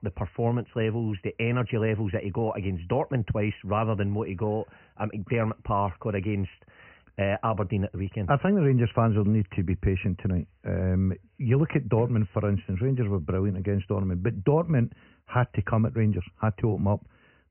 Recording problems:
high frequencies cut off; severe; nothing above 3 kHz

